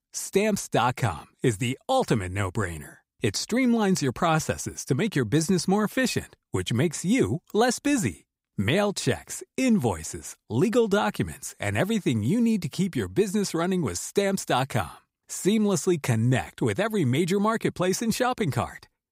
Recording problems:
none

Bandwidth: 15.5 kHz